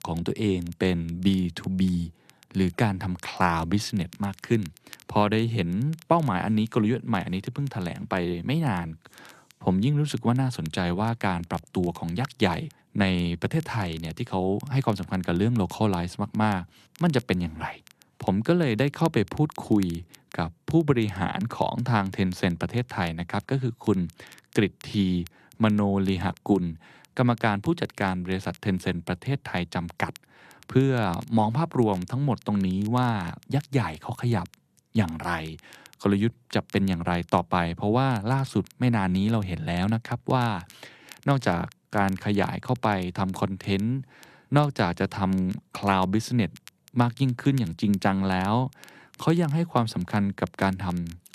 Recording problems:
crackle, like an old record; faint; 25 dB below the speech

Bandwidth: 13.5 kHz